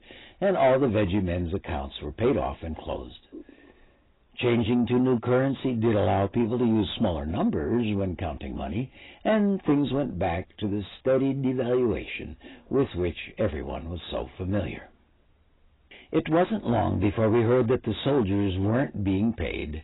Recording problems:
garbled, watery; badly; nothing above 4 kHz
distortion; slight; 10 dB below the speech

